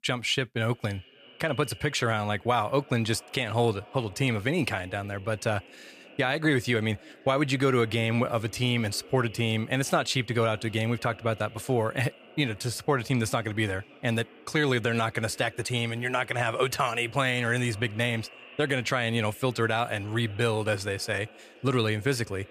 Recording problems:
echo of what is said; faint; throughout; 570 ms later, 20 dB below the speech

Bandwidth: 15 kHz